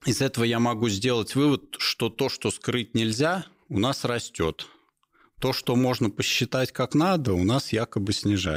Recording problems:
abrupt cut into speech; at the end

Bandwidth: 15.5 kHz